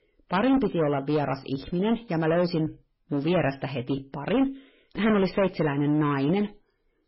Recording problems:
garbled, watery; badly; nothing above 5.5 kHz
distortion; slight; 10% of the sound clipped

